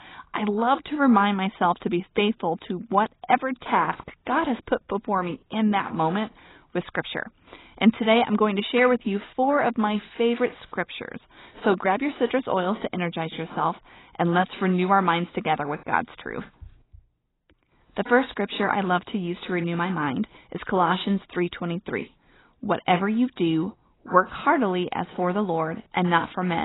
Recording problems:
garbled, watery; badly; nothing above 4 kHz
abrupt cut into speech; at the end

